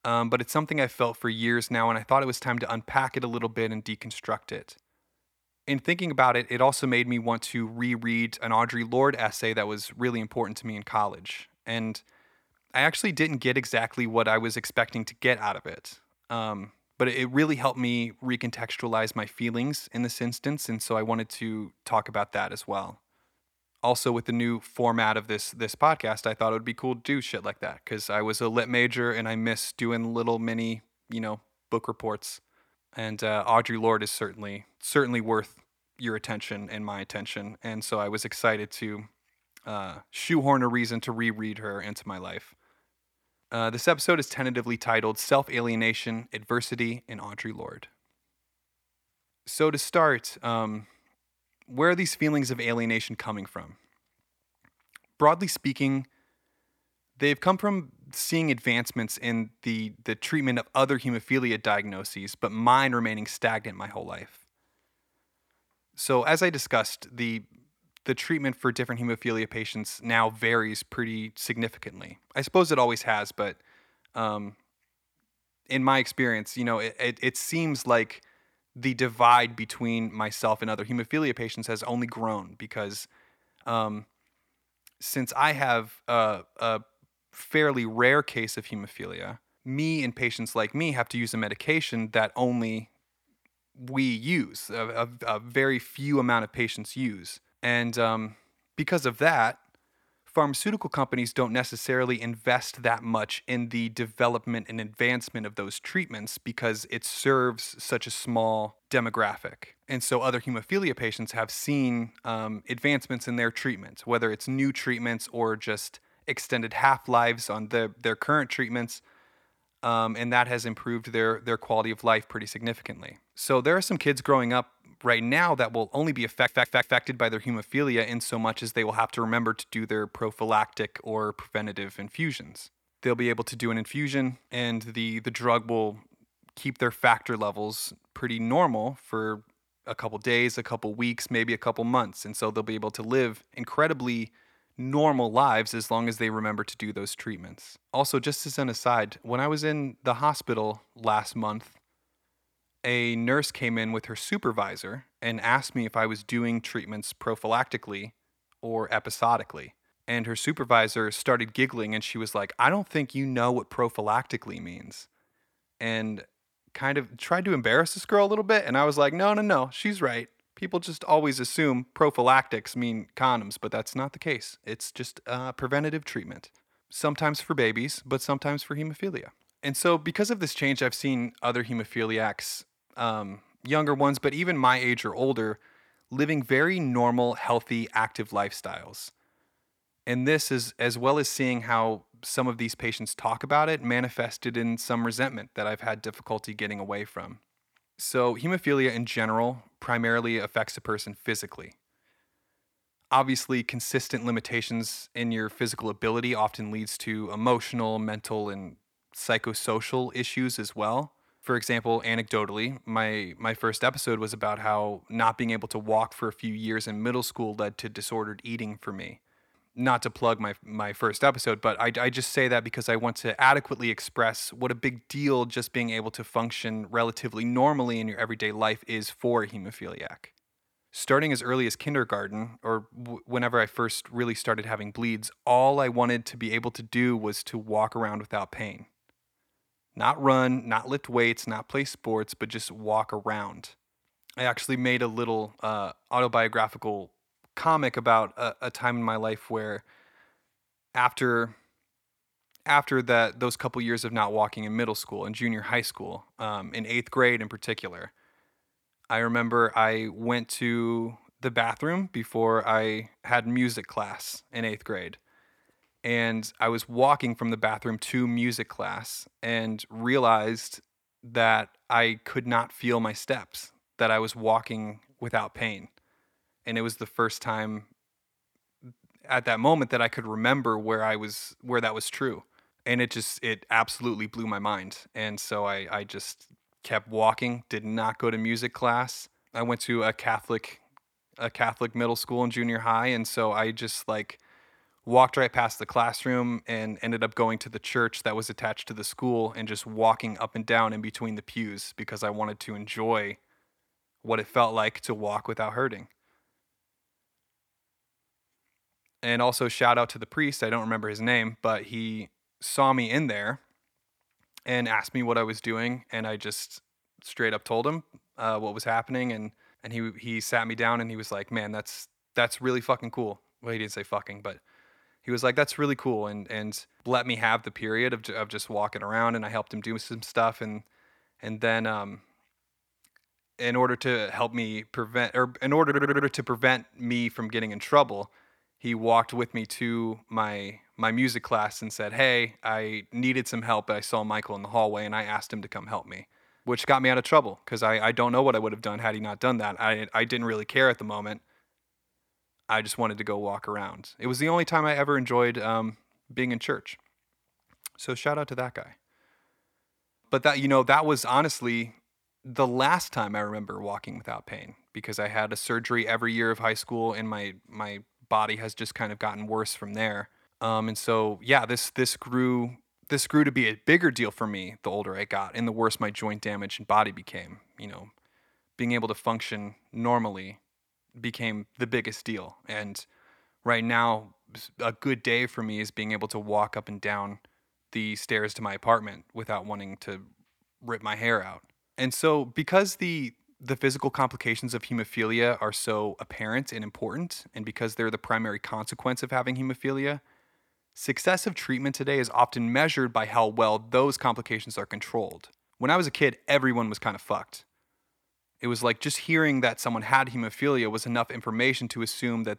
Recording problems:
audio stuttering; at 2:06 and at 5:36

